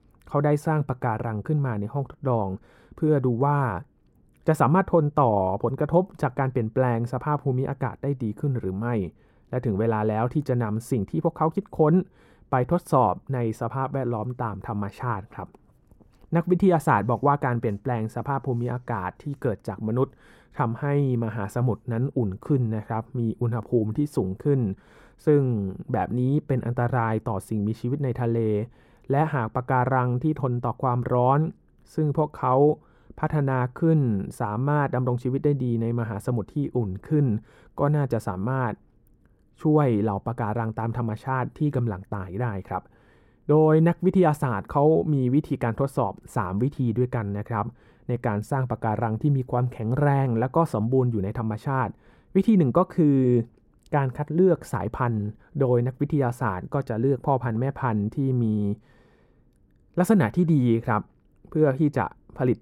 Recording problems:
muffled; slightly; fading above 2 kHz

